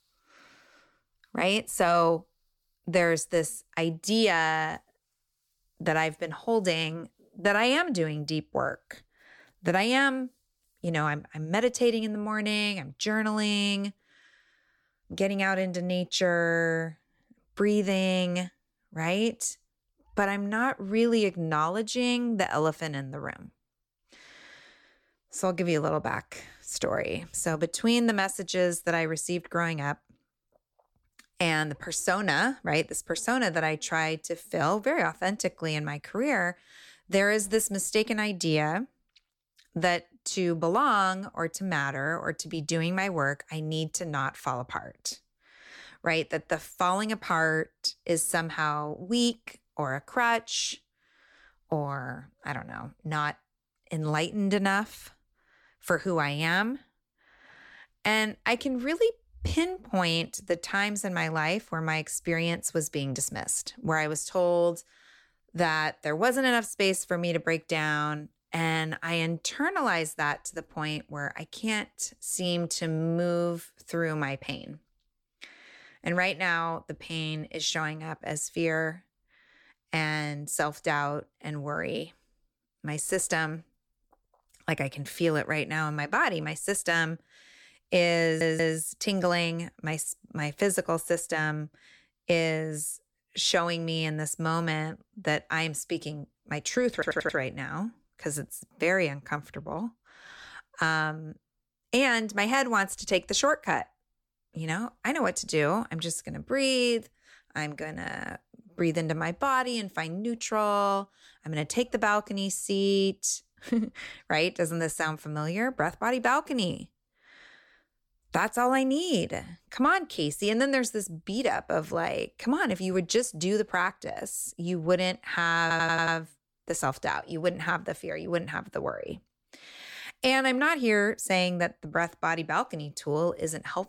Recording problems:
audio stuttering; at 1:28, at 1:37 and at 2:06

